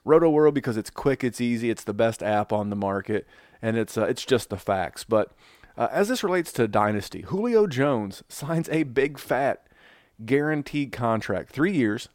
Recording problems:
none

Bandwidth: 16.5 kHz